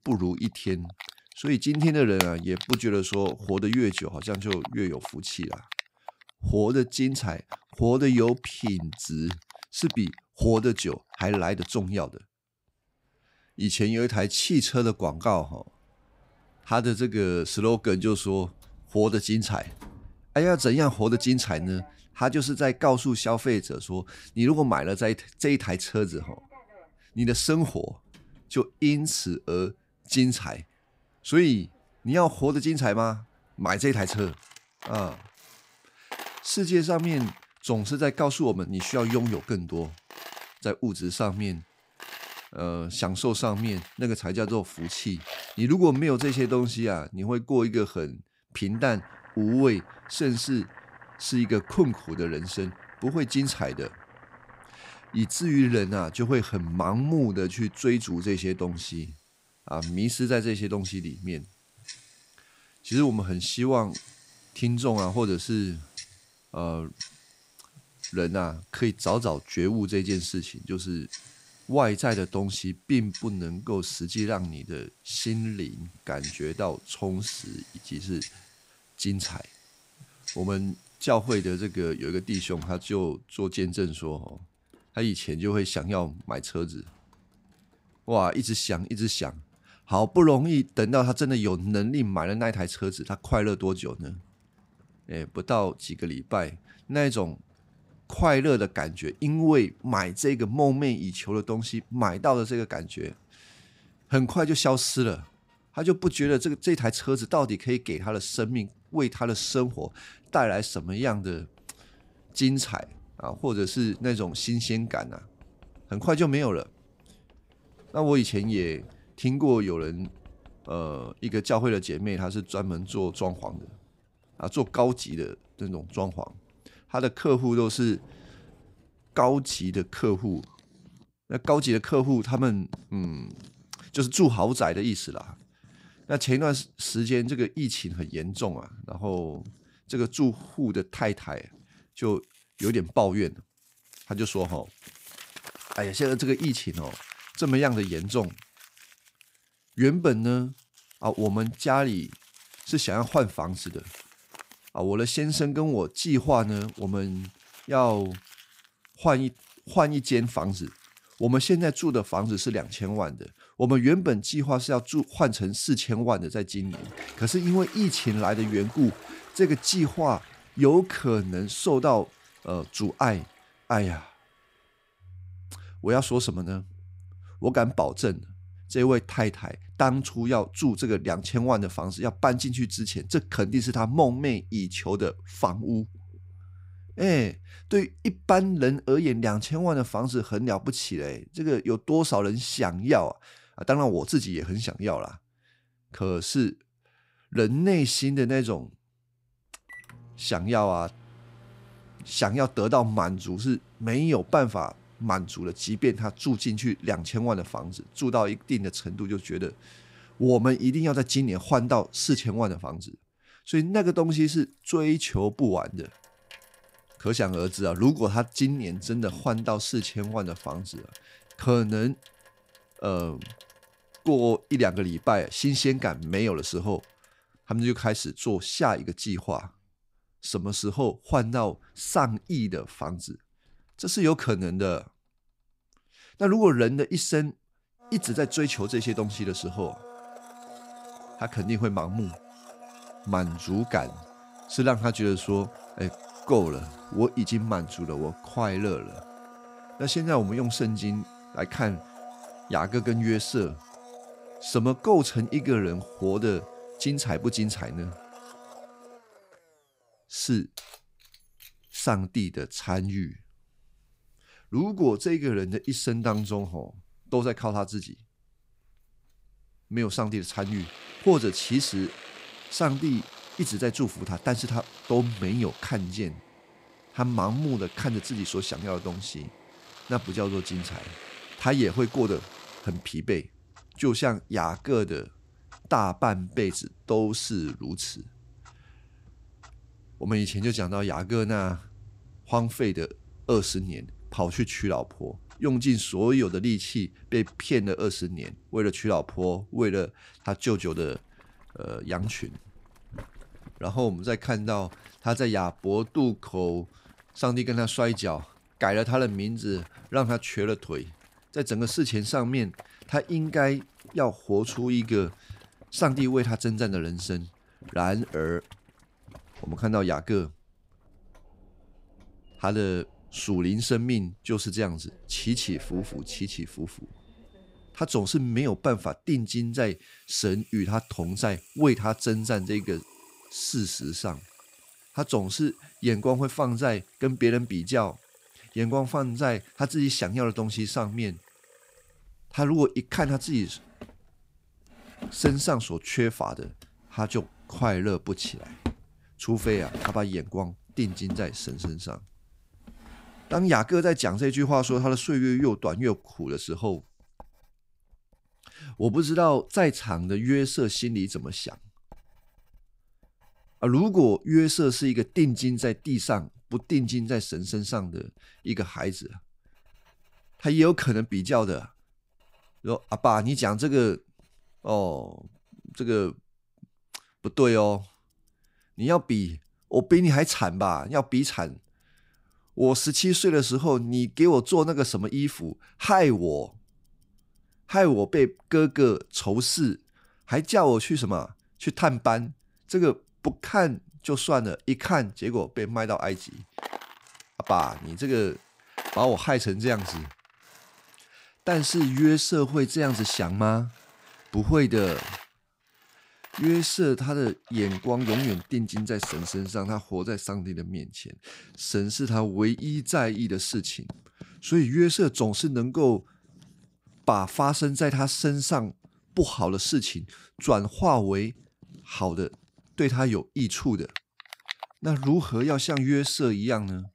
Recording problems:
household noises; noticeable; throughout; 20 dB below the speech

